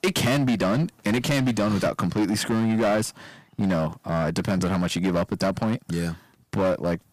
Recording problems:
distortion; heavy; 14% of the sound clipped

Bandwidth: 15 kHz